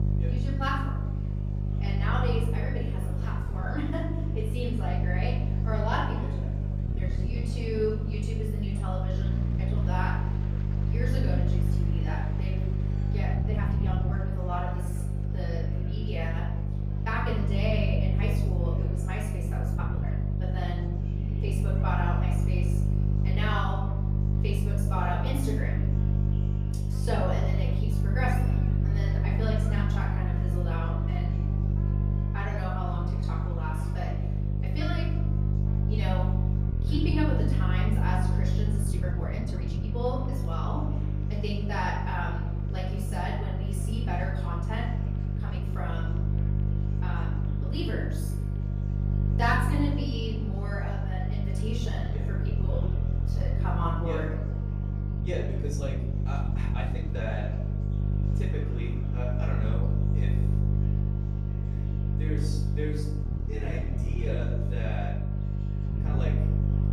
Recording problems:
off-mic speech; far
room echo; noticeable; dies away in 0.8 s
electrical hum; loud; throughout; 50 Hz, 6 dB below the speech
murmuring crowd; noticeable; throughout; 15 dB below the speech
background music; faint; throughout; 25 dB below the speech
uneven, jittery; strongly; from 3.5 s to 1:06

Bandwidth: 15 kHz